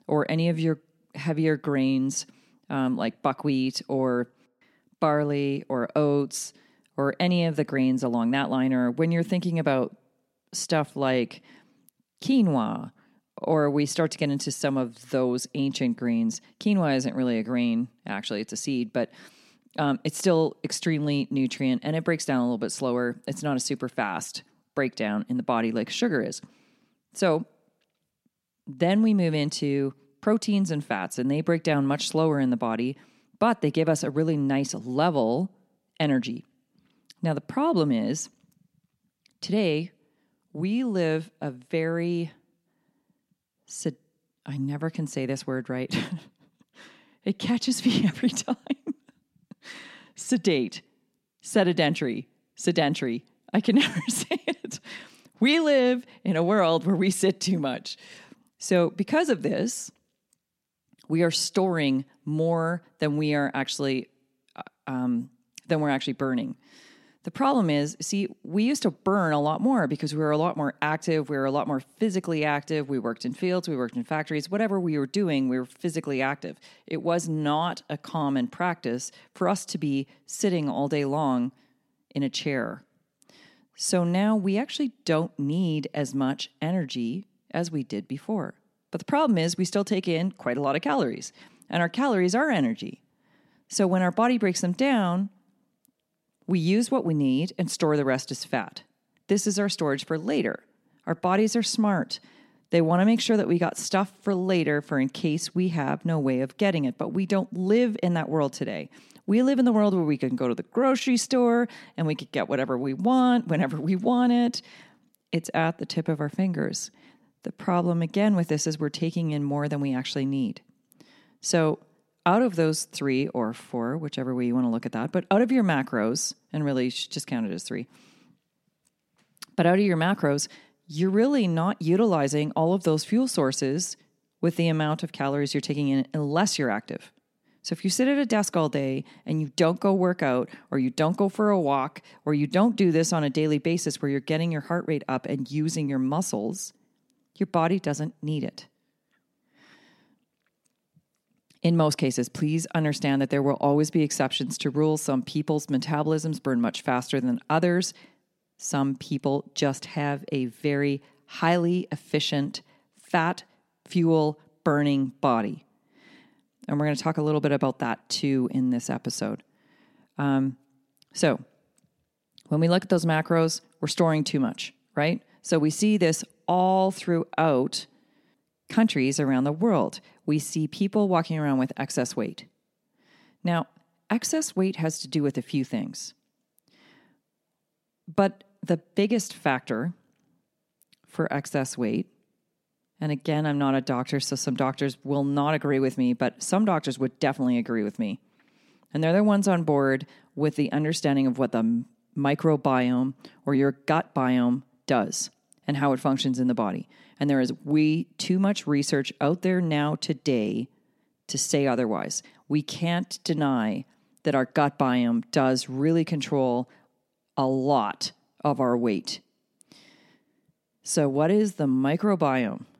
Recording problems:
none

